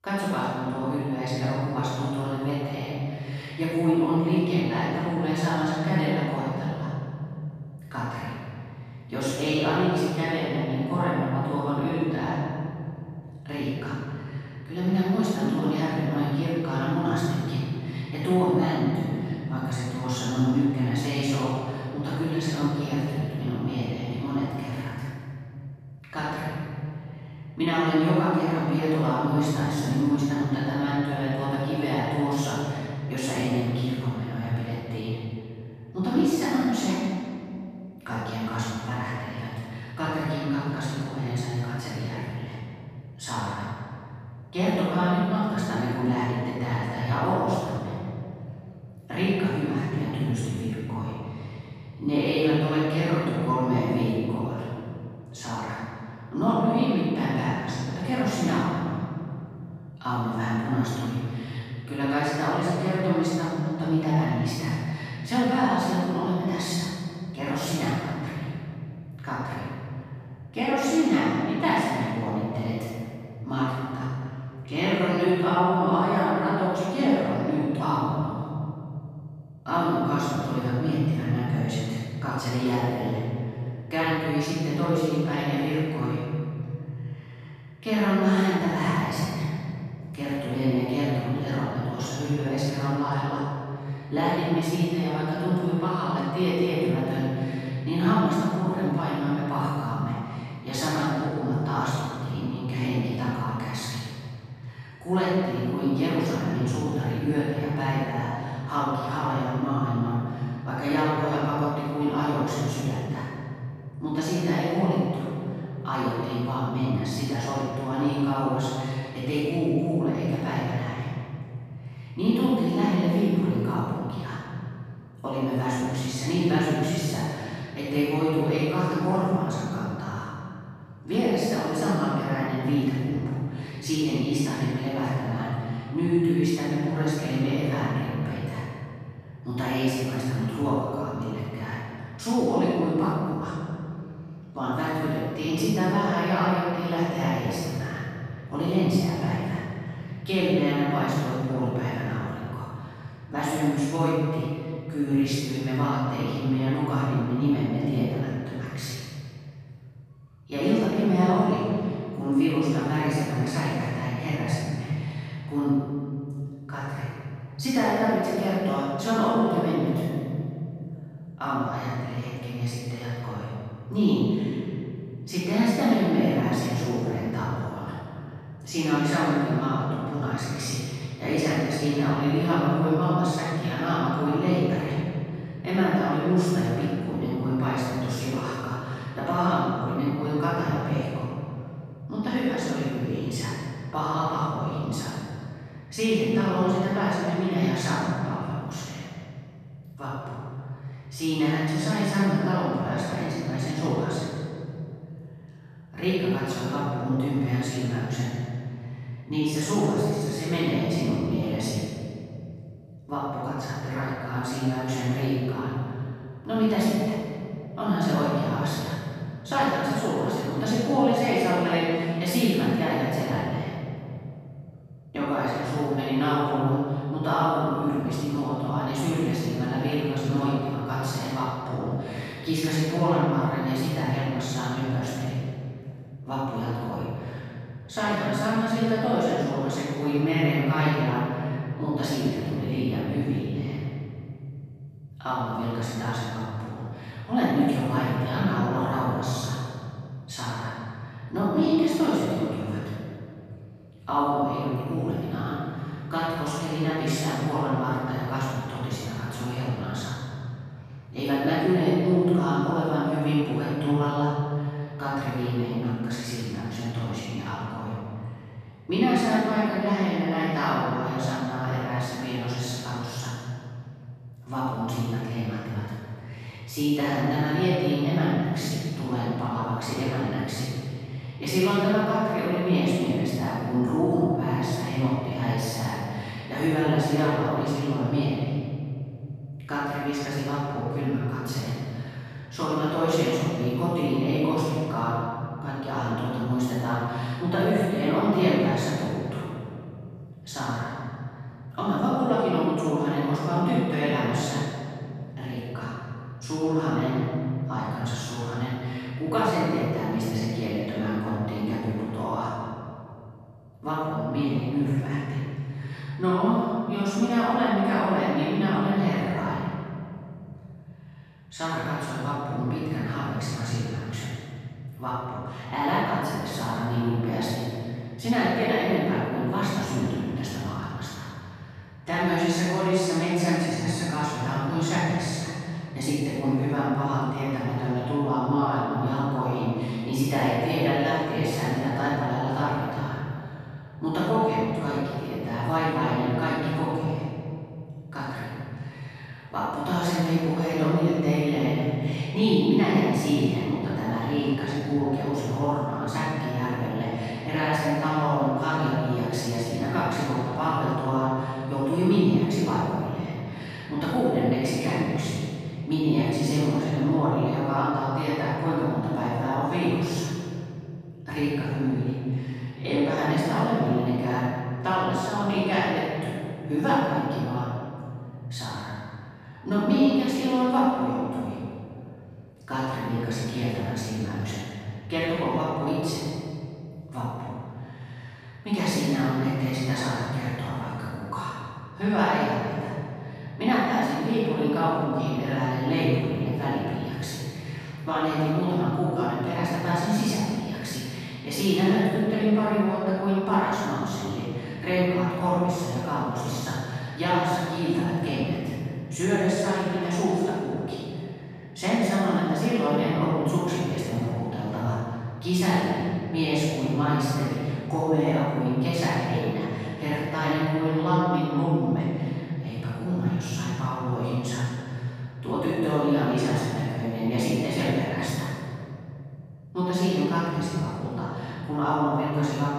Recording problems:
room echo; strong; dies away in 3 s
off-mic speech; far

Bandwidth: 14 kHz